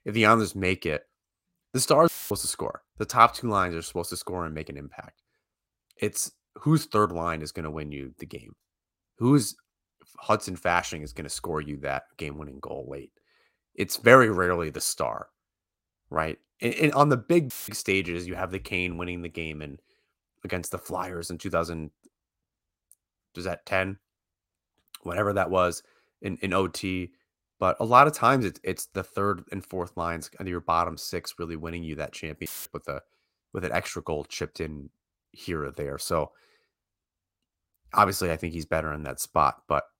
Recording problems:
audio cutting out; filled with static; at 2 s, at 18 s and at 32 s

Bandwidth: 16 kHz